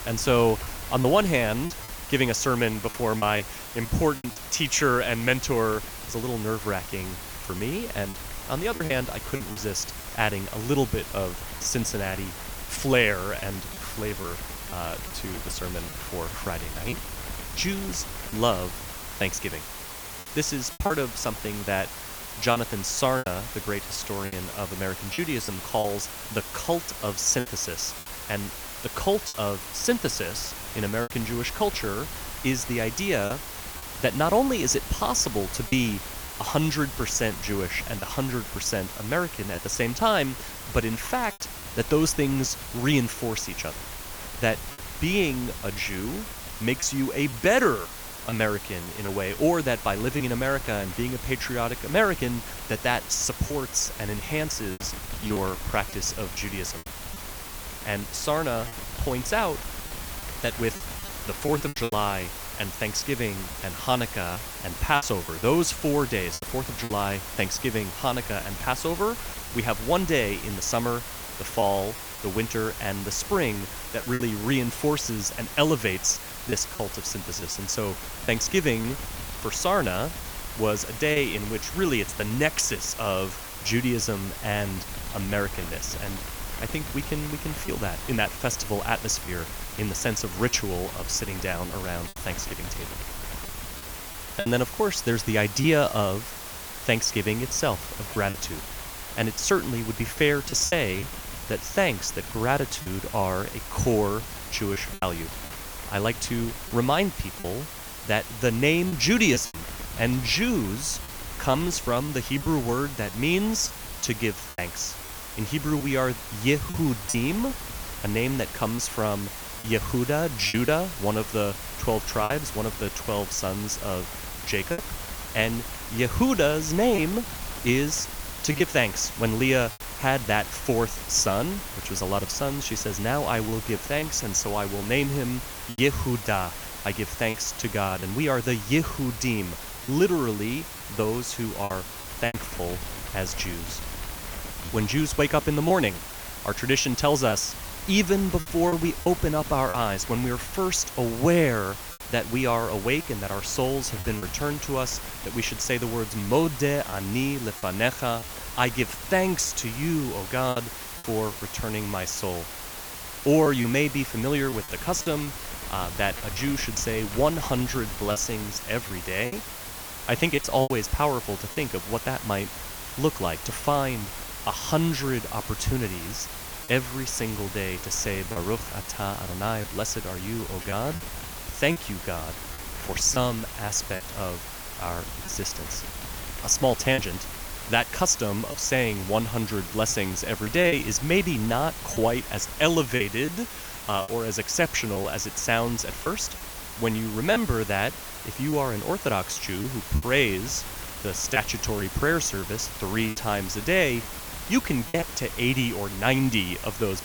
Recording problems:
hiss; loud; throughout; 9 dB below the speech
wind noise on the microphone; occasional gusts; 20 dB below the speech
choppy; occasionally; 4% of the speech affected

